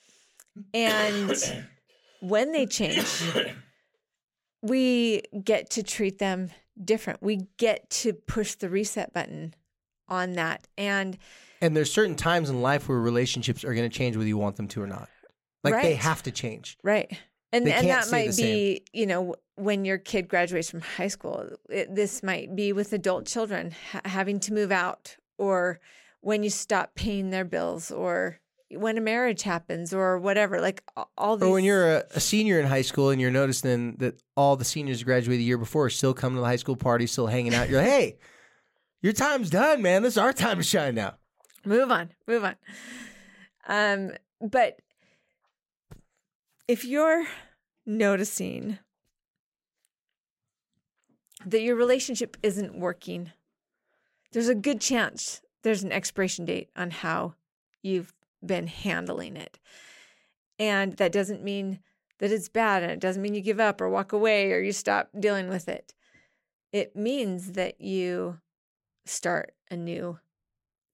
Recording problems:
none

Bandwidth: 16 kHz